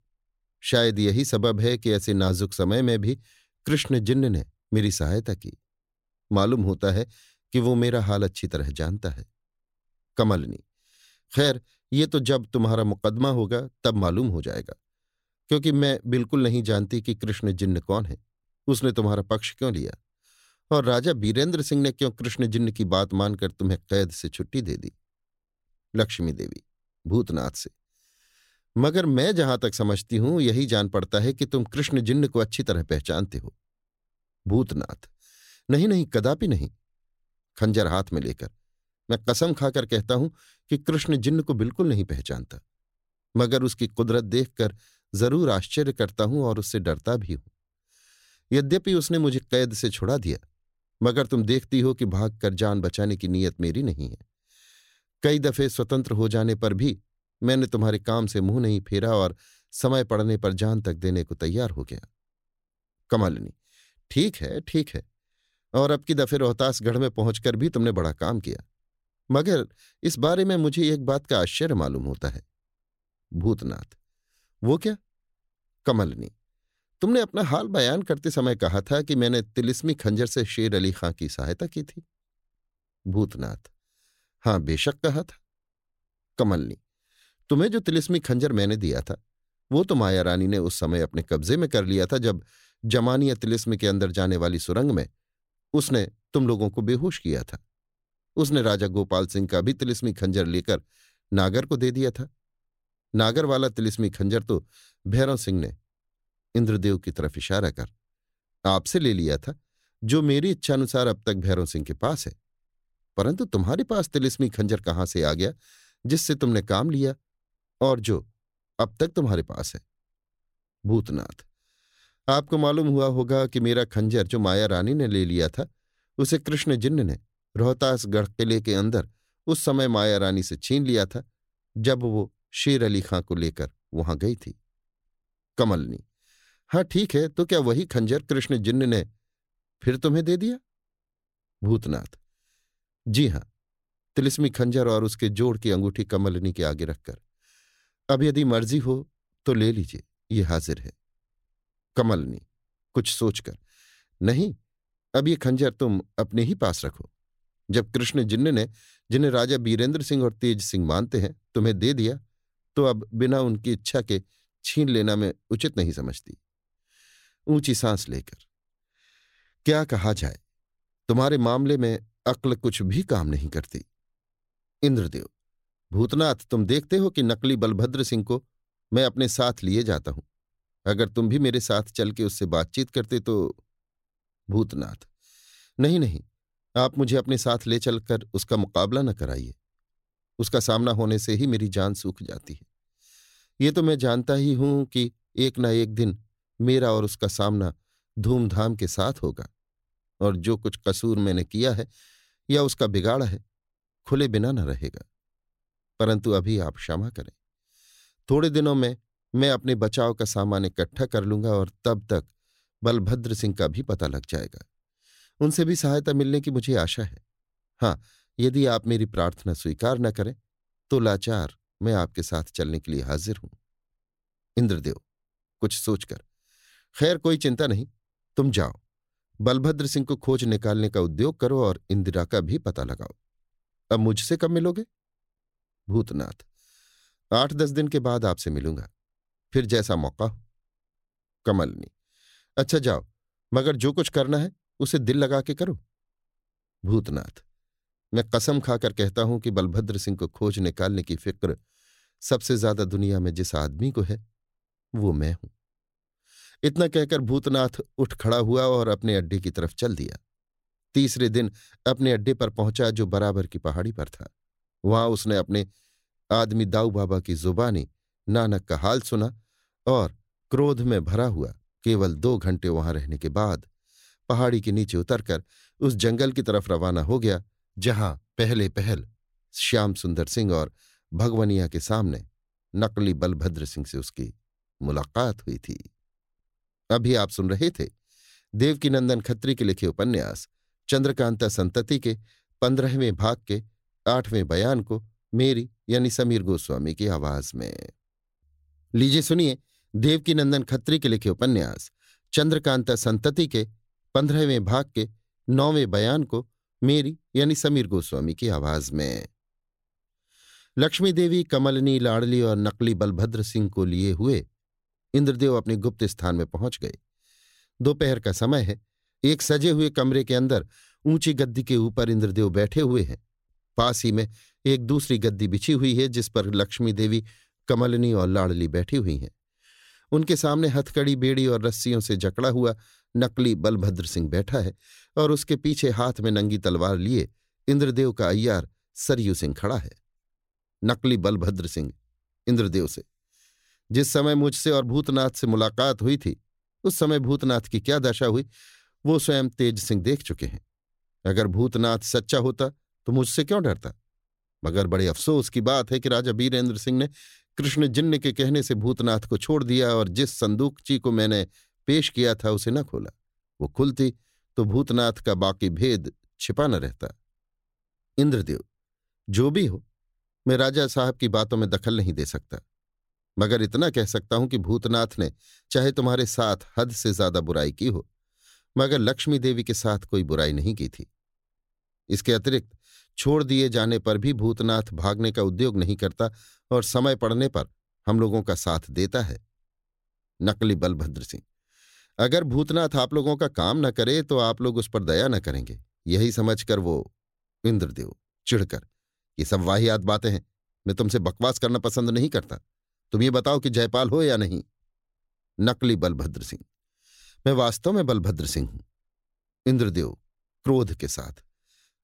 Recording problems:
none

